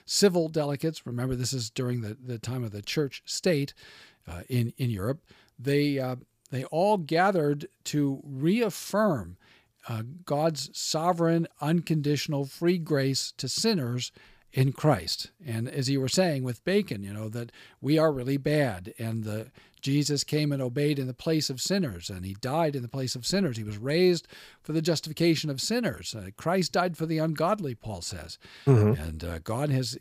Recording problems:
none

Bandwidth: 15 kHz